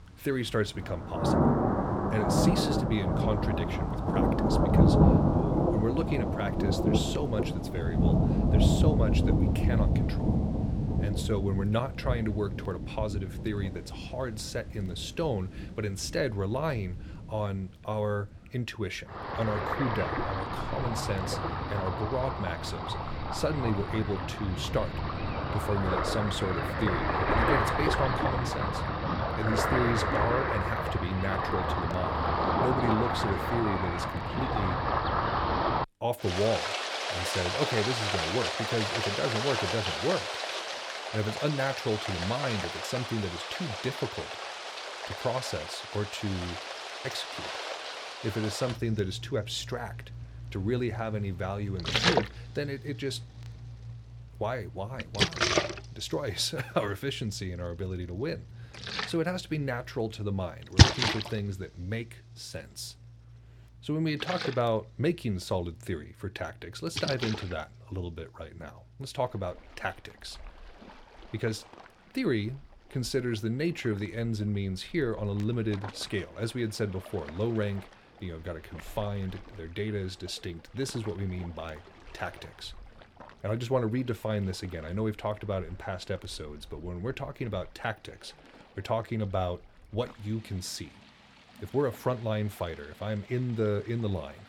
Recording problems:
rain or running water; very loud; throughout; 3 dB above the speech

